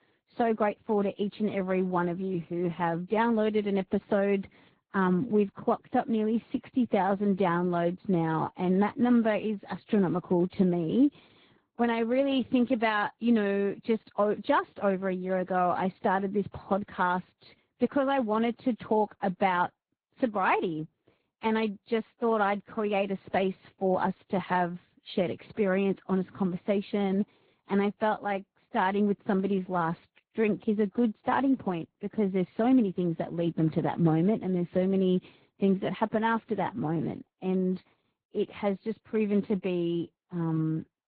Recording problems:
garbled, watery; badly
high frequencies cut off; severe; nothing above 4 kHz

